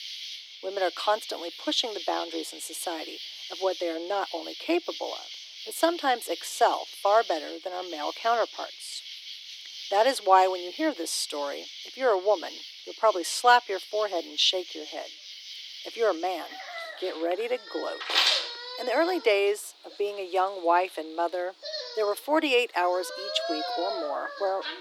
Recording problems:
thin; very; fading below 300 Hz
animal sounds; loud; throughout; 8 dB below the speech

